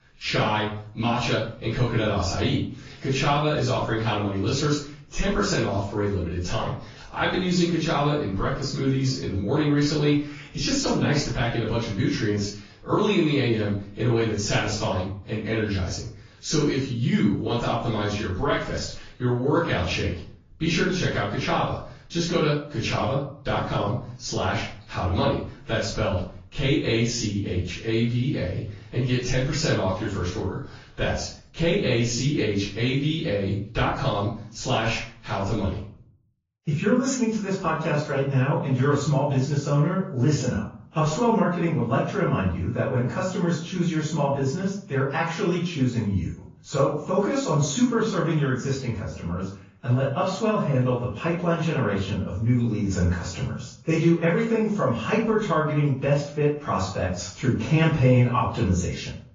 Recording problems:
off-mic speech; far
room echo; noticeable; dies away in 0.4 s
garbled, watery; slightly; nothing above 6.5 kHz

